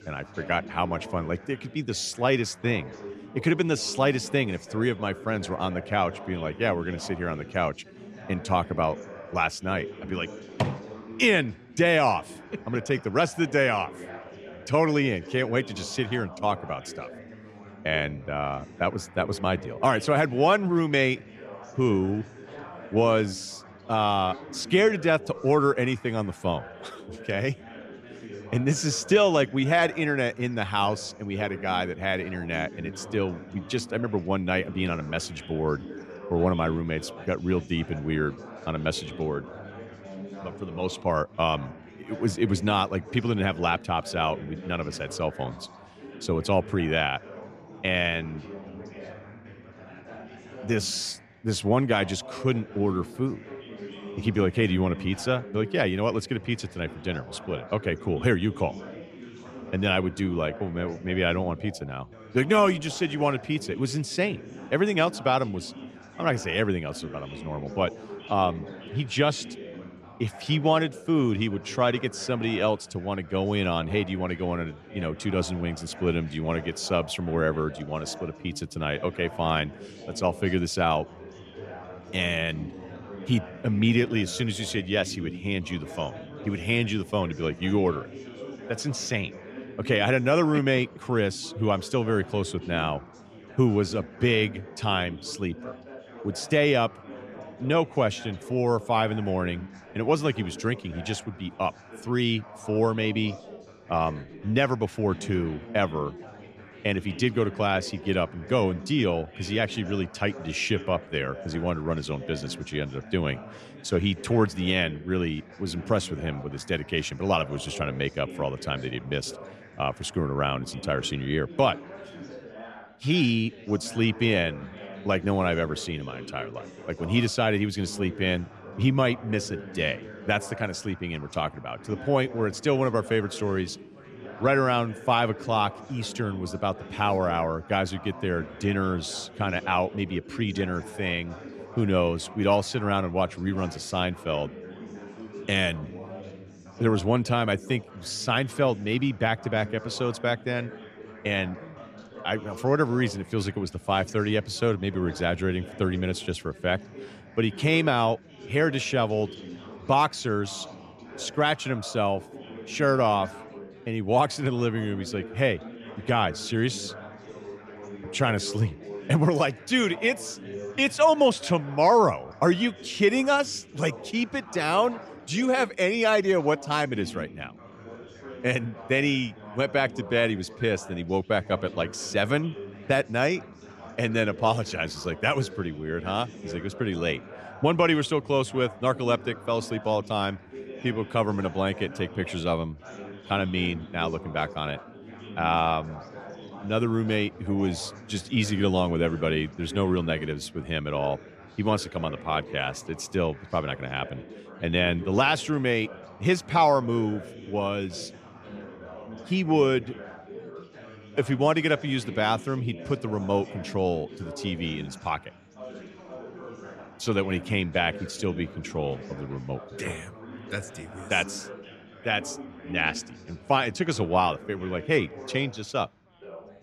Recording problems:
chatter from many people; noticeable; throughout; 15 dB below the speech

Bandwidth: 14.5 kHz